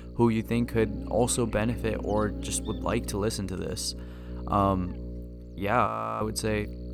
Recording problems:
electrical hum; noticeable; throughout; 60 Hz, 15 dB below the speech
audio freezing; at 6 s

